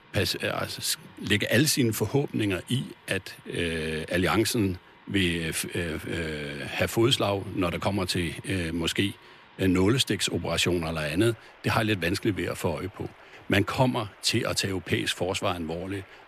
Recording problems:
rain or running water; faint; throughout; 25 dB below the speech

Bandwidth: 14 kHz